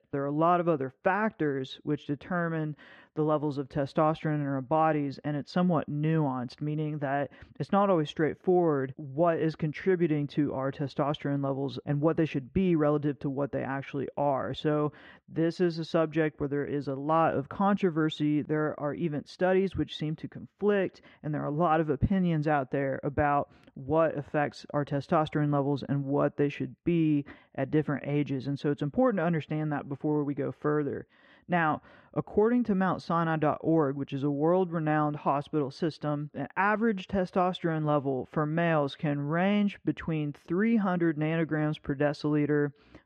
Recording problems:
muffled; very; fading above 2 kHz

